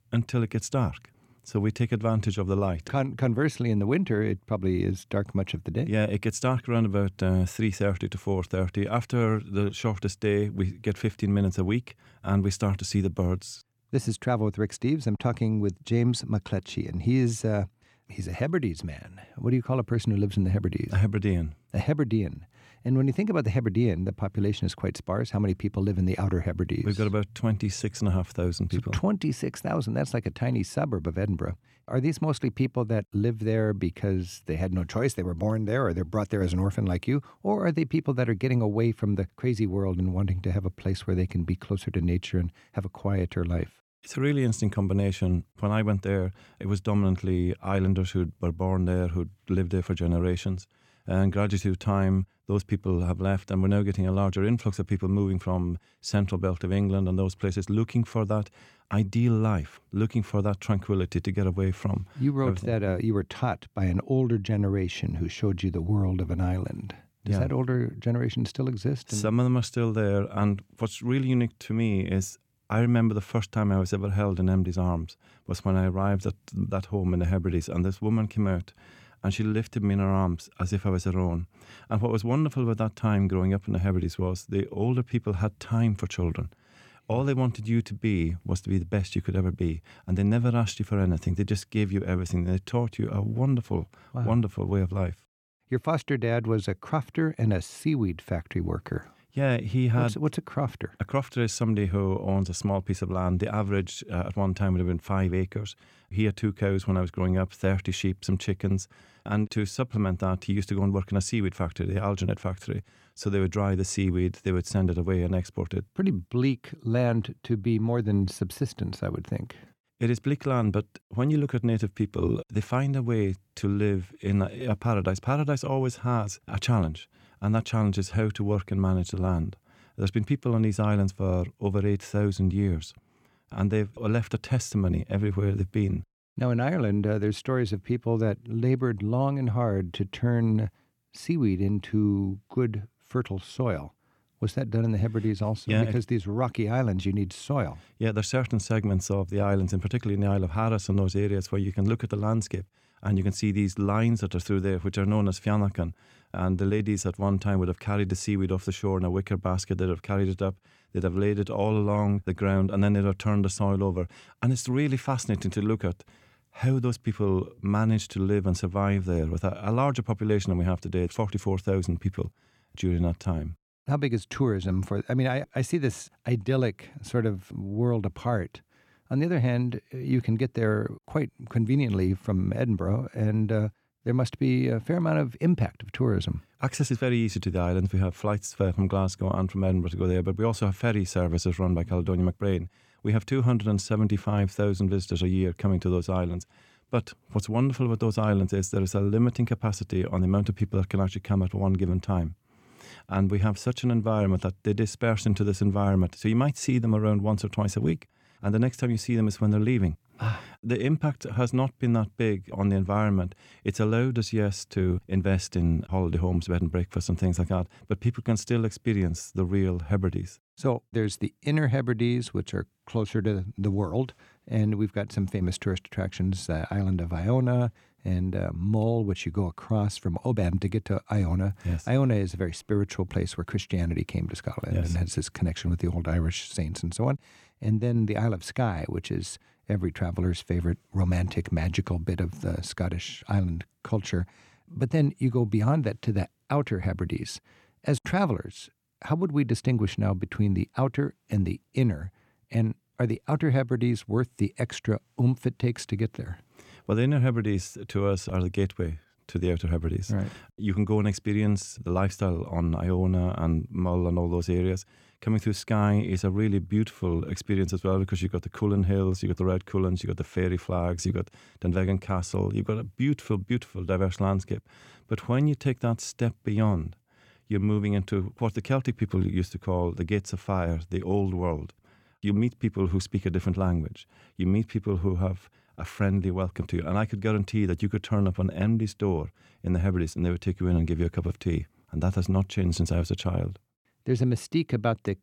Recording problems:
none

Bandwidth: 17.5 kHz